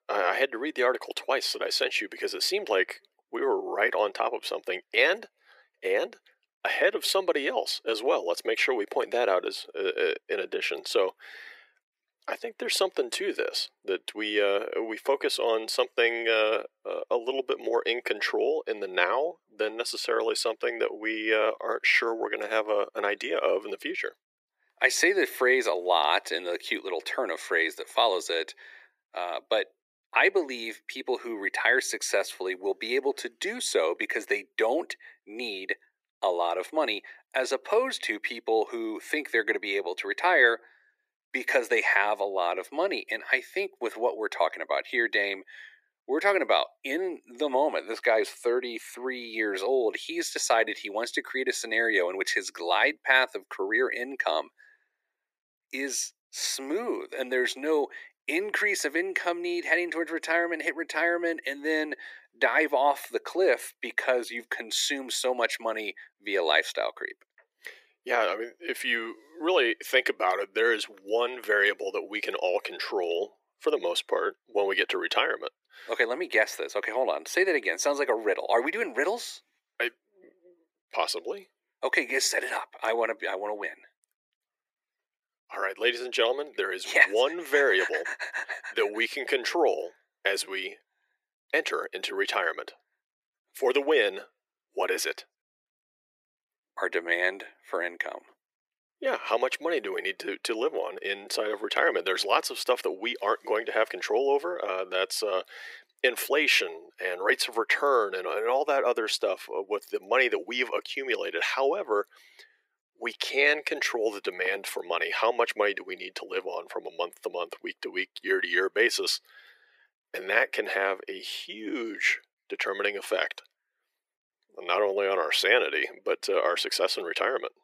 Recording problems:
thin; very; fading below 350 Hz

